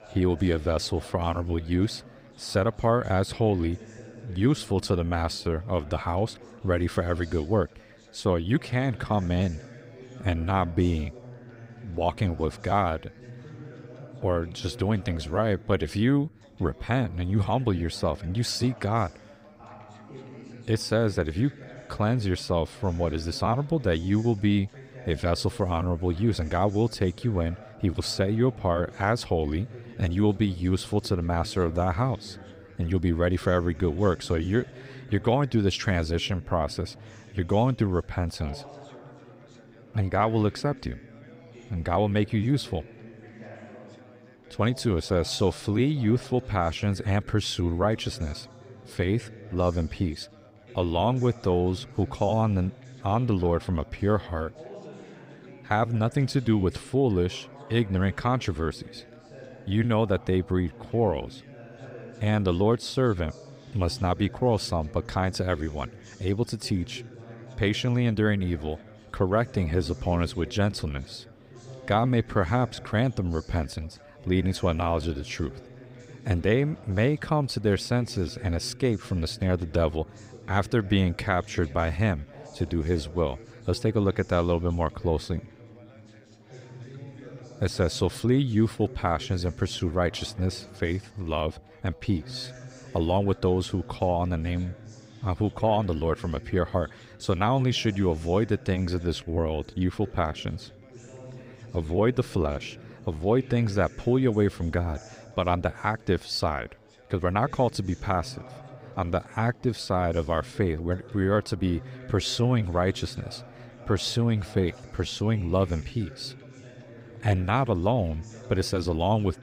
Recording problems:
background chatter; noticeable; throughout; 2 voices, 20 dB below the speech

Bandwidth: 15.5 kHz